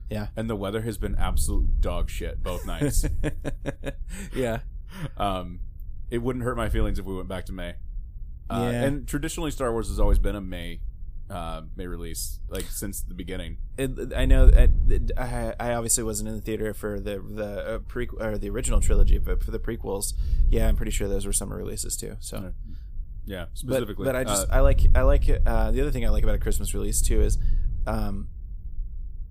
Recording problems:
wind noise on the microphone; occasional gusts; 20 dB below the speech

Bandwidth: 15 kHz